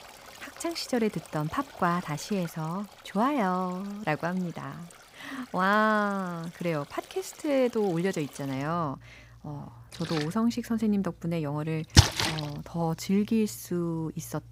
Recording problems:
rain or running water; very loud; throughout; 4 dB above the speech

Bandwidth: 15.5 kHz